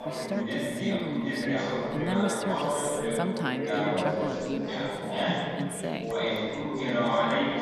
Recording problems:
chatter from many people; very loud; throughout; 4 dB above the speech
phone ringing; faint; from 6 s on; peak 15 dB below the speech

